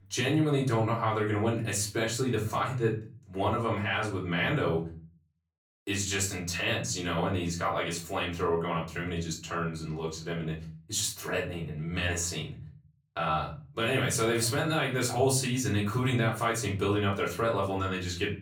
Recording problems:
off-mic speech; far
room echo; slight; dies away in 0.4 s

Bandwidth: 18.5 kHz